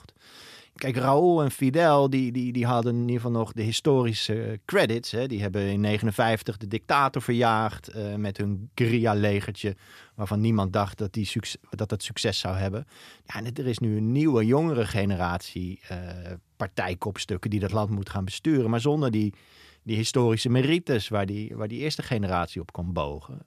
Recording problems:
none

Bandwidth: 14.5 kHz